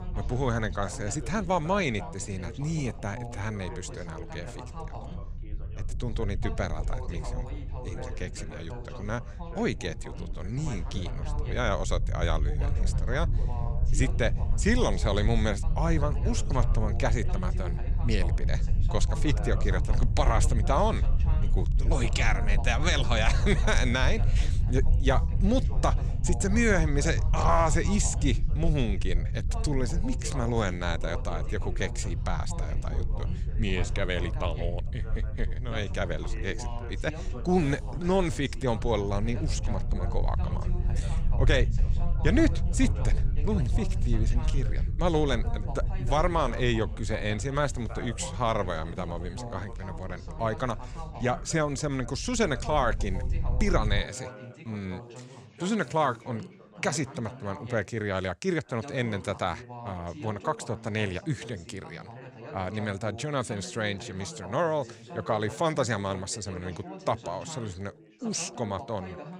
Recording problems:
background chatter; noticeable; throughout; 2 voices, 15 dB below the speech
low rumble; noticeable; until 54 s; 15 dB below the speech

